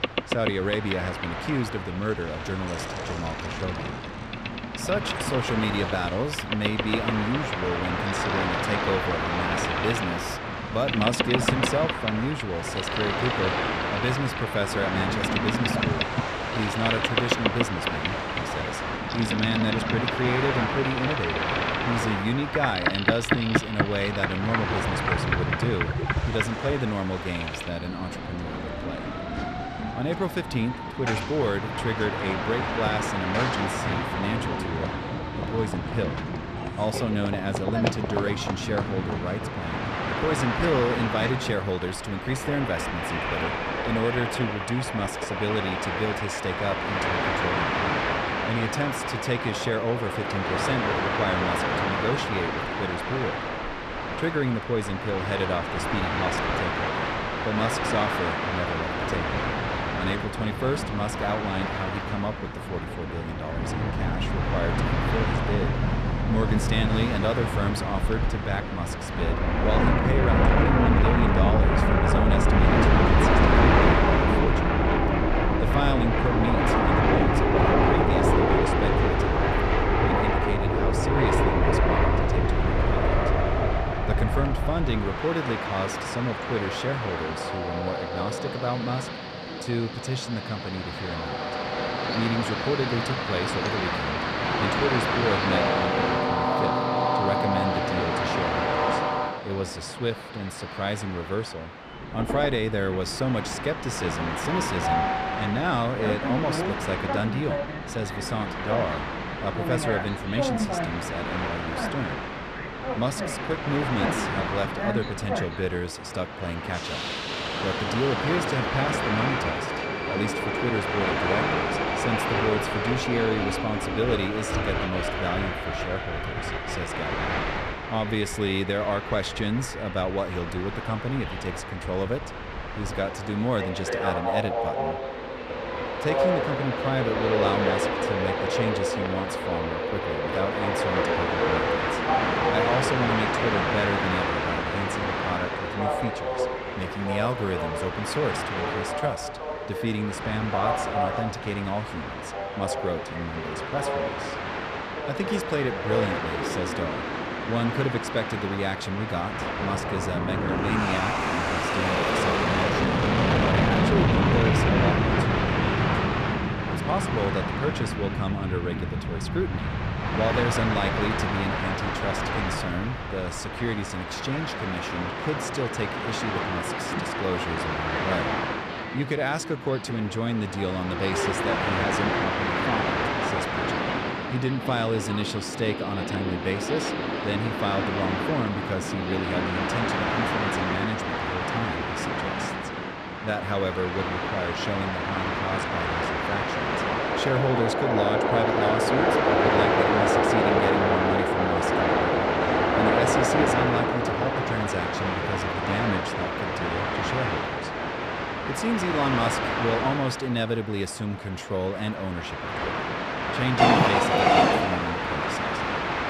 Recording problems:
train or aircraft noise; very loud; throughout; 4 dB above the speech

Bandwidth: 14 kHz